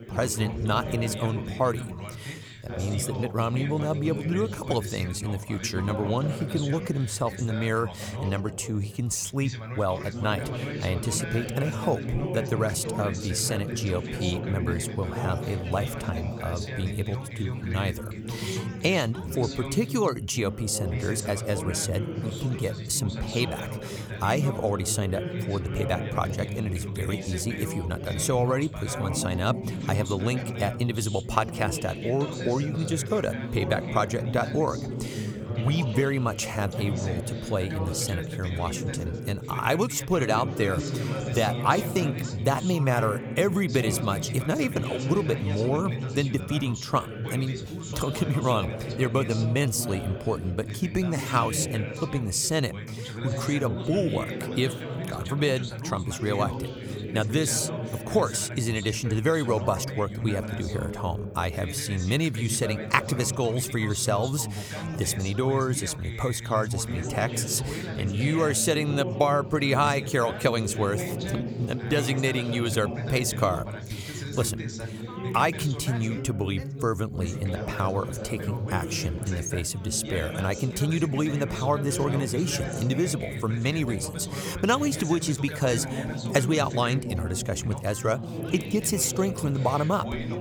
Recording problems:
background chatter; loud; throughout; 3 voices, 6 dB below the speech

